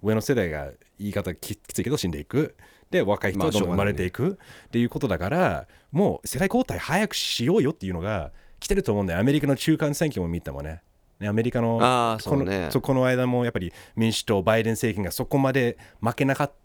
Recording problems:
uneven, jittery; strongly; from 1.5 to 14 s

